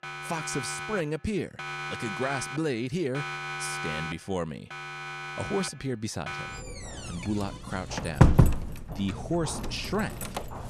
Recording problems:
alarms or sirens; very loud; throughout; 1 dB above the speech

